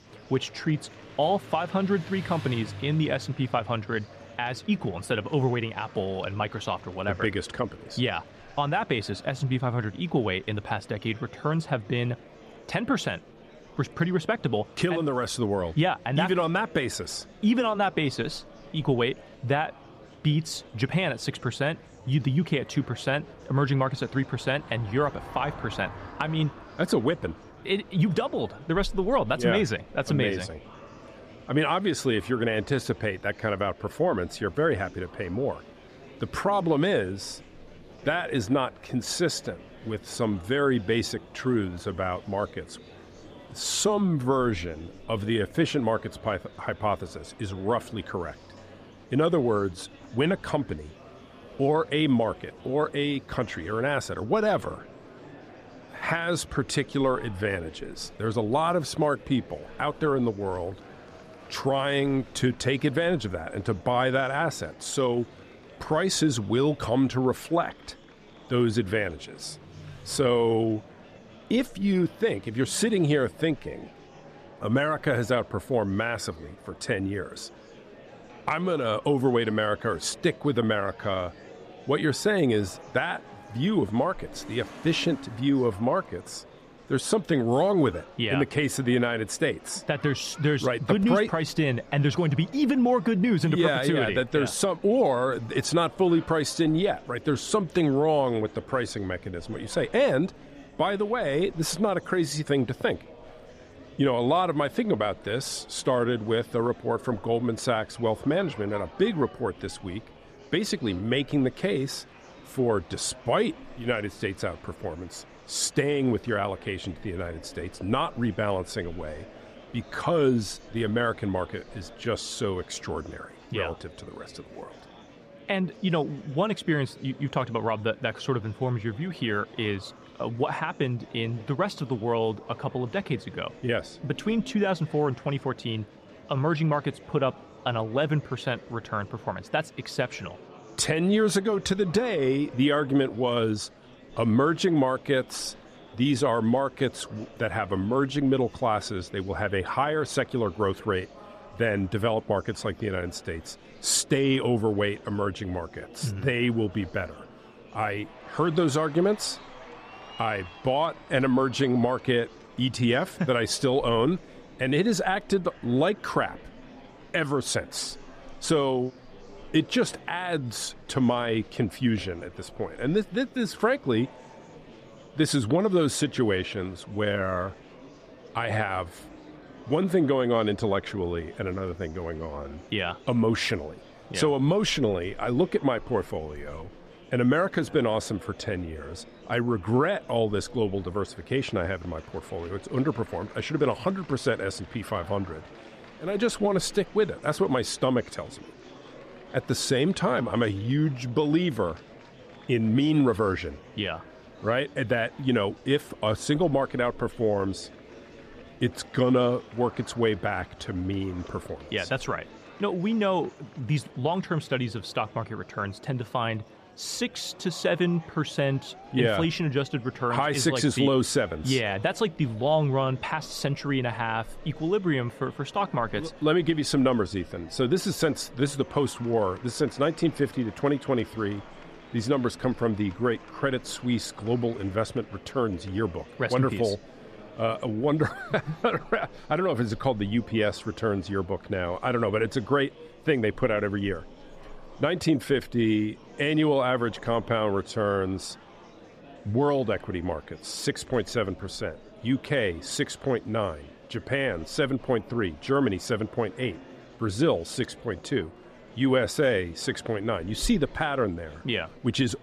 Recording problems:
traffic noise; faint; throughout; 25 dB below the speech
murmuring crowd; faint; throughout; 20 dB below the speech

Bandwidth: 14.5 kHz